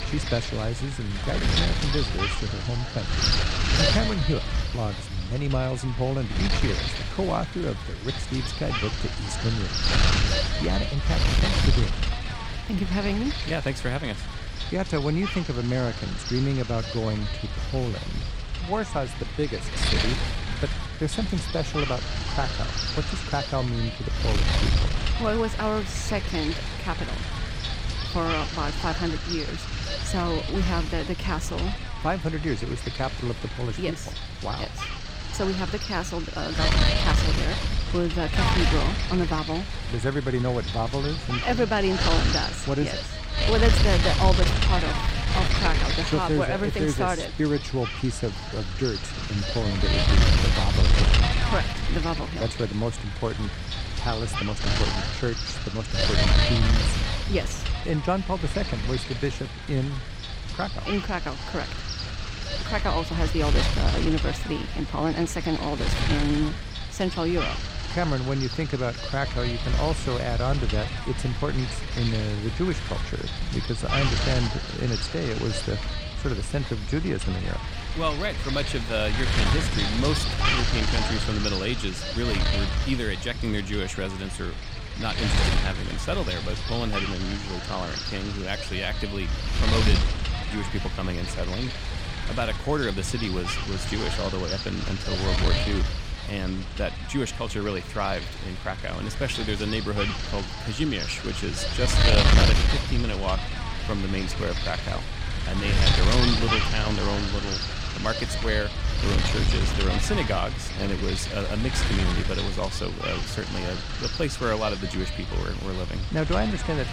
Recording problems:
wind noise on the microphone; heavy; 1 dB above the speech

